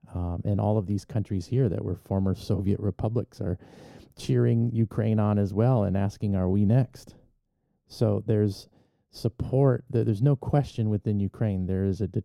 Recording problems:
muffled; slightly; fading above 1 kHz

